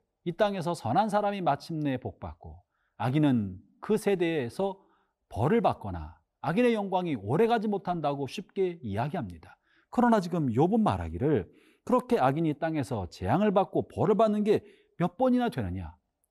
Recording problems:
none

